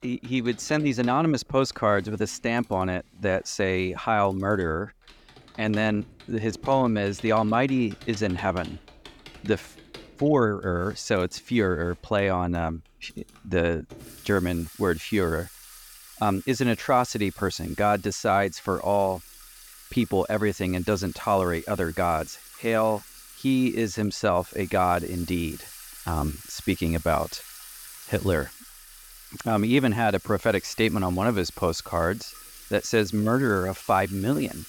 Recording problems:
household noises; noticeable; throughout; 20 dB below the speech

